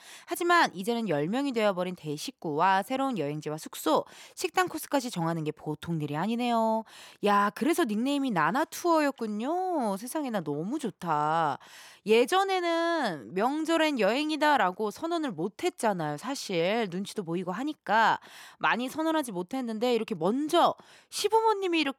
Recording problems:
none

